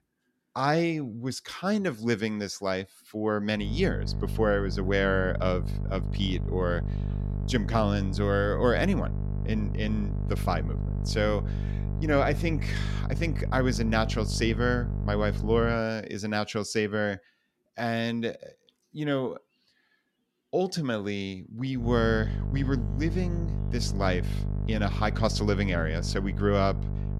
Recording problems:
electrical hum; noticeable; from 3.5 to 16 s and from 22 s on; 50 Hz, 15 dB below the speech

